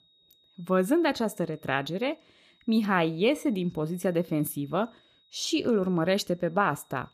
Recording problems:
high-pitched whine; faint; throughout; 4 kHz, 35 dB below the speech

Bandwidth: 14.5 kHz